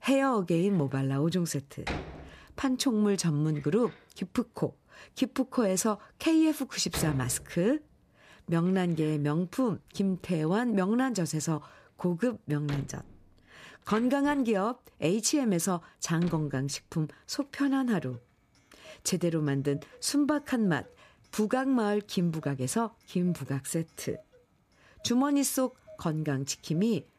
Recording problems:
household noises; noticeable; throughout; 15 dB below the speech

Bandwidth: 14.5 kHz